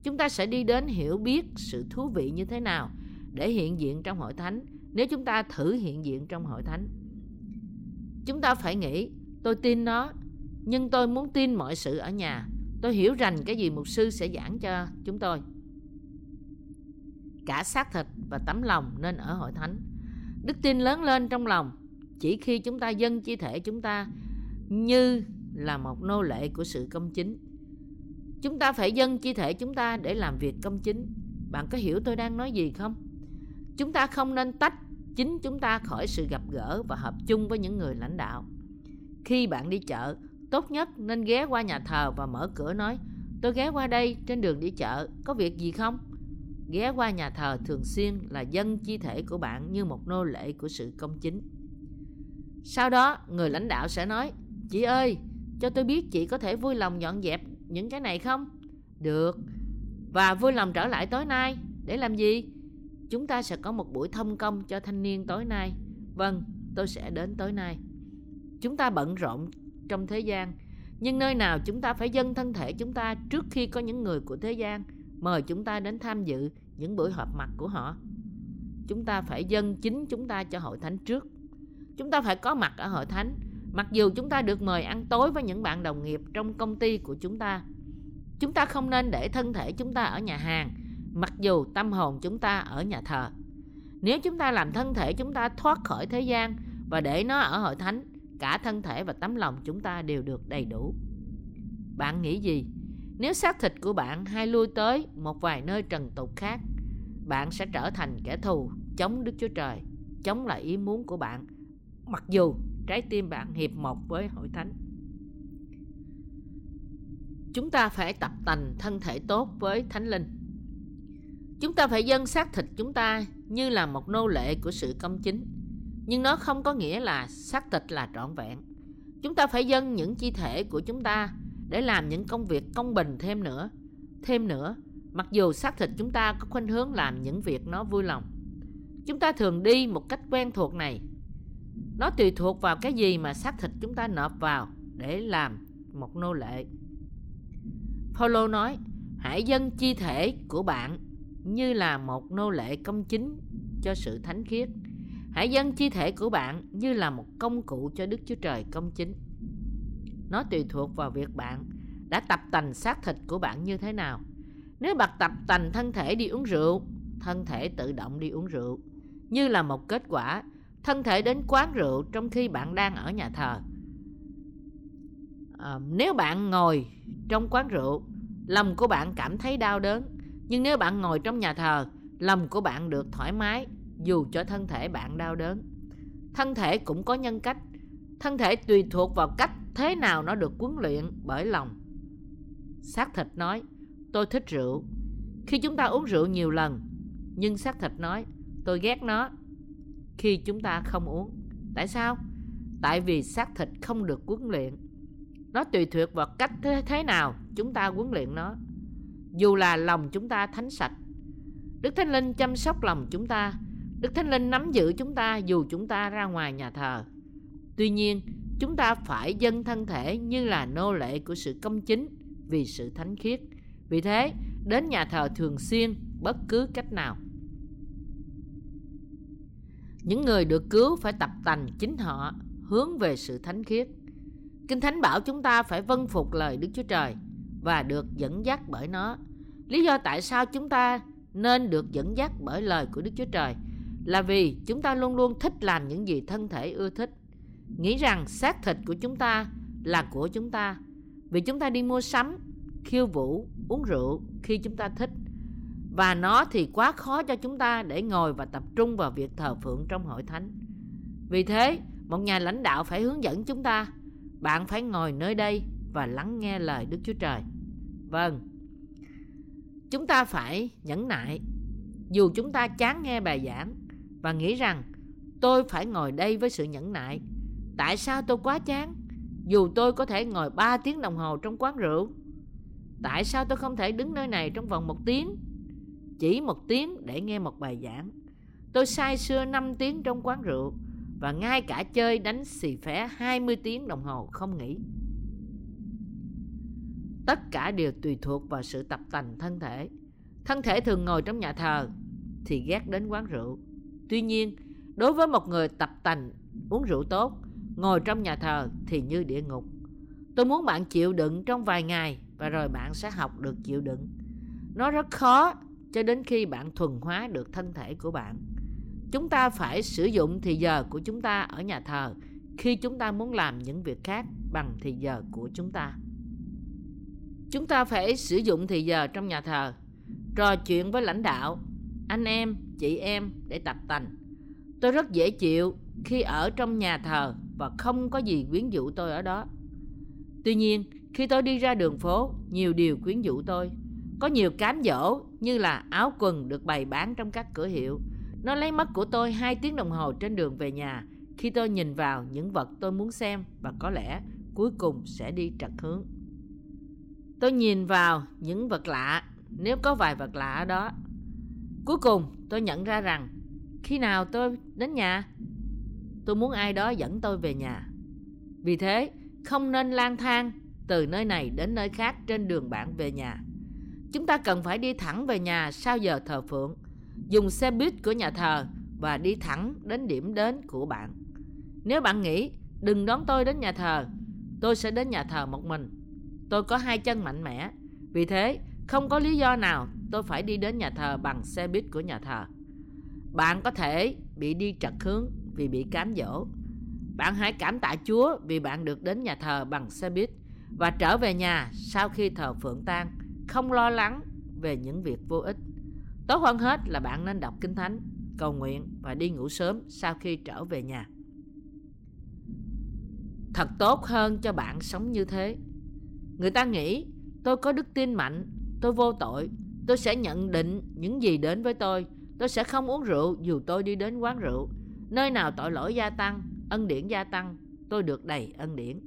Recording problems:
low rumble; faint; throughout; 20 dB below the speech

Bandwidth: 16 kHz